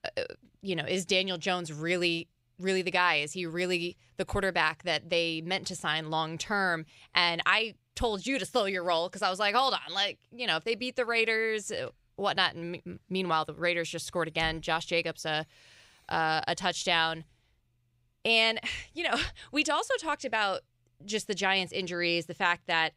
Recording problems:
none

